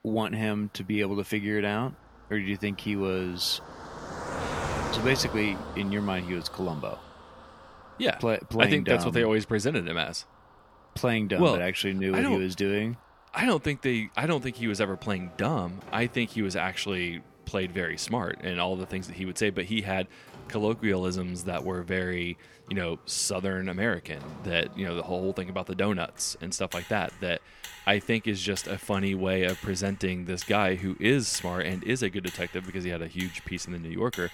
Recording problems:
traffic noise; noticeable; throughout; 15 dB below the speech

